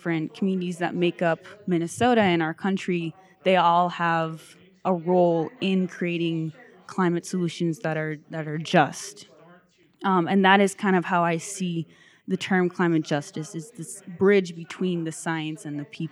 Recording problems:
background chatter; faint; throughout; 2 voices, 30 dB below the speech

